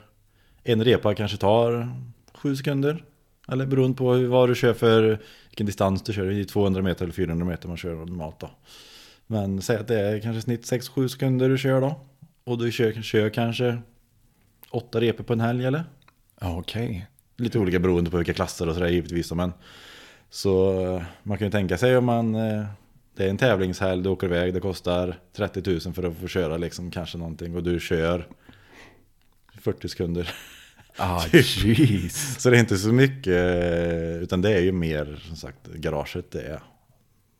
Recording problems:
none

